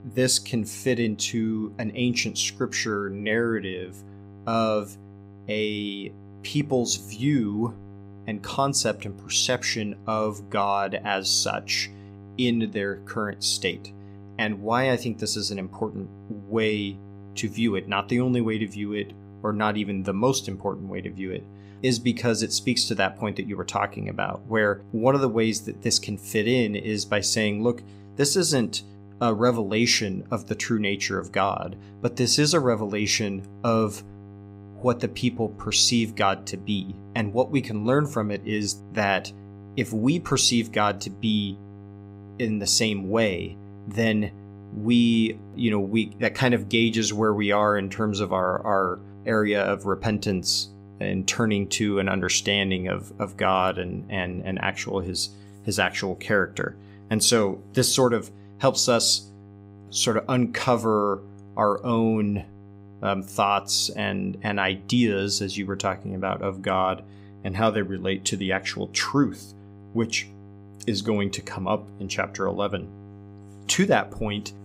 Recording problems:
electrical hum; faint; throughout; 50 Hz, 25 dB below the speech

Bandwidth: 15.5 kHz